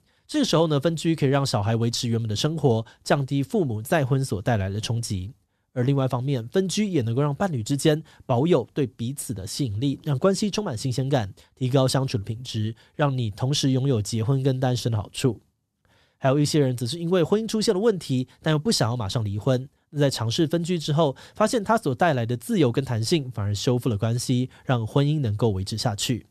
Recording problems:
none

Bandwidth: 13.5 kHz